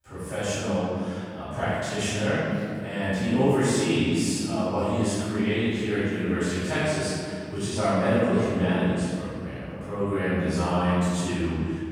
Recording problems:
room echo; strong; dies away in 2.2 s
off-mic speech; far

